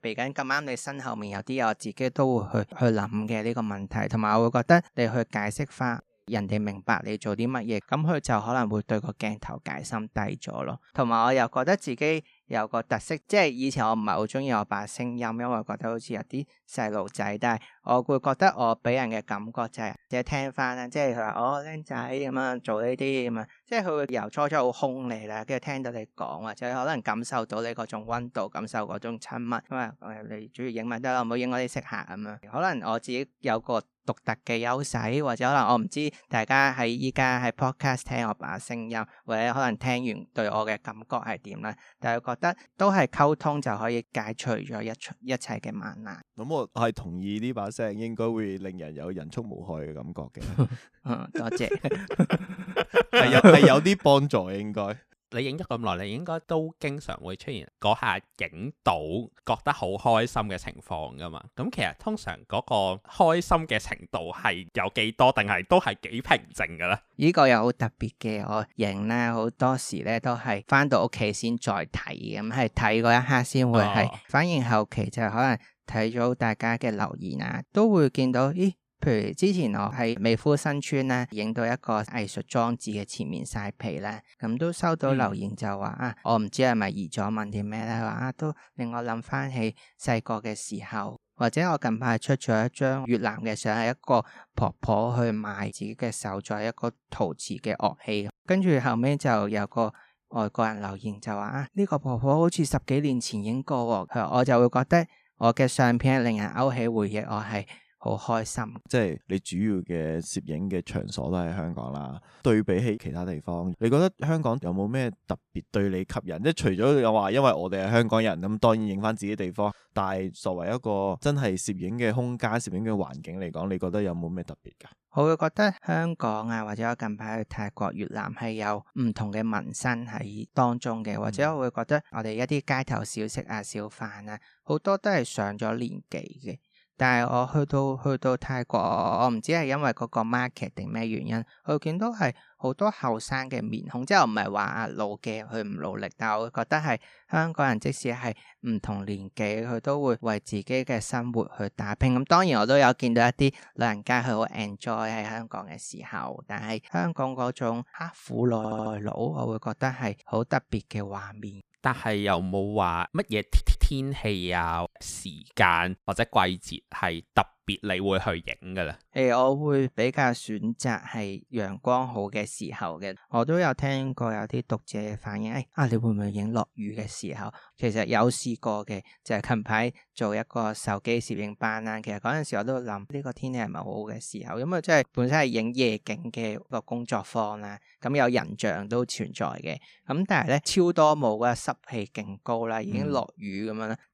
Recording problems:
audio stuttering; 4 times, first at 52 s

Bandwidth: 14.5 kHz